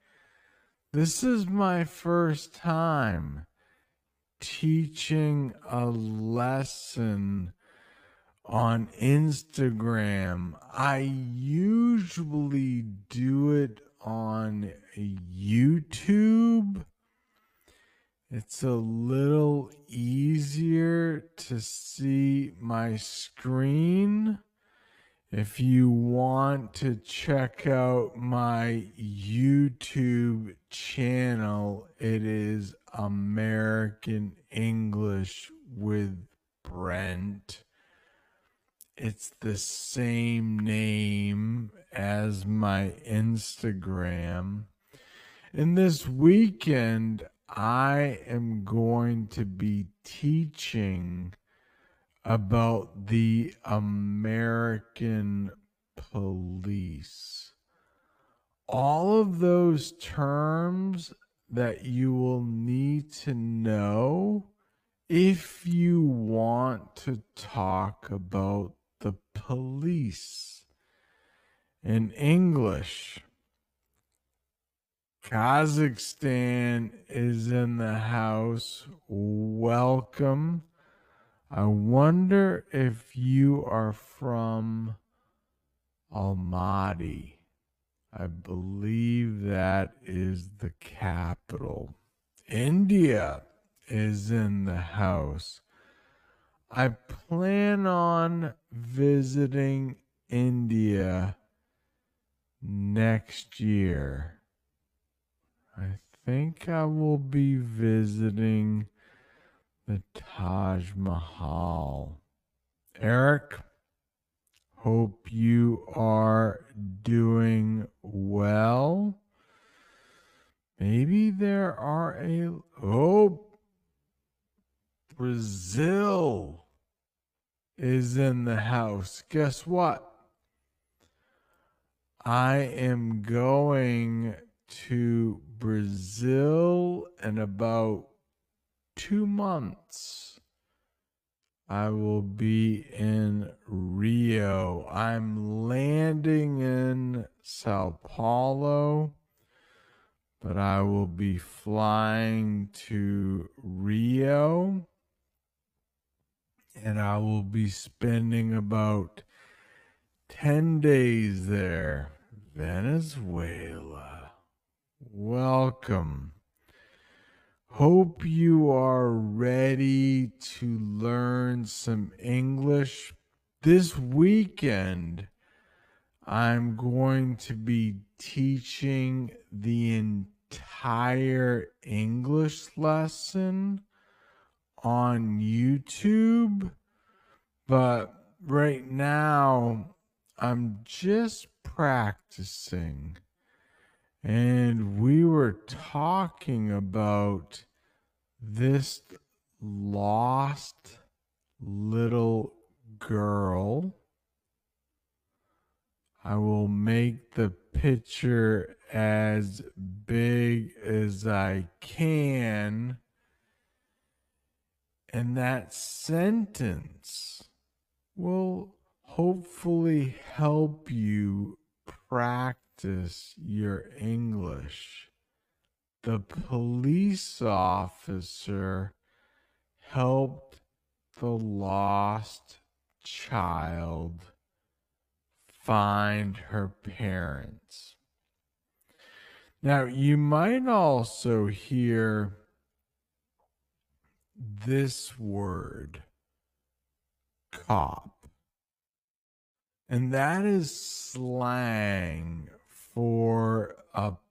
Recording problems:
wrong speed, natural pitch; too slow; 0.5 times normal speed

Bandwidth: 15 kHz